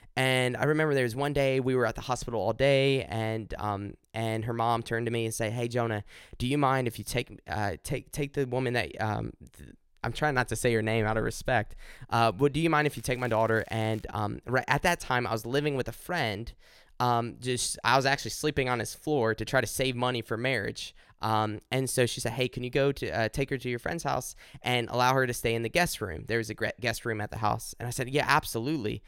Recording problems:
crackling; faint; from 13 to 14 s; 25 dB below the speech

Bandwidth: 16.5 kHz